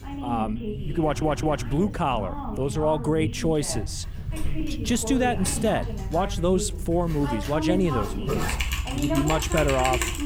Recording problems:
household noises; loud; throughout; 6 dB below the speech
voice in the background; loud; throughout; 8 dB below the speech
low rumble; faint; throughout; 25 dB below the speech
audio stuttering; at 1 s

